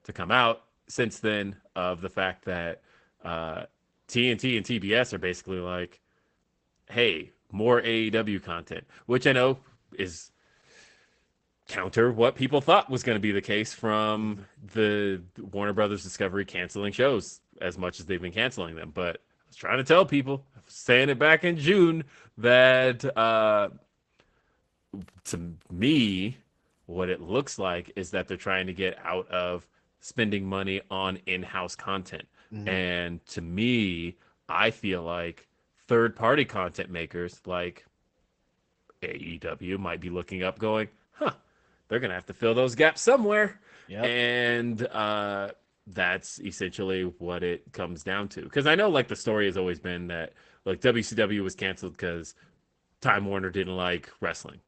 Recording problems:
garbled, watery; badly; nothing above 12 kHz

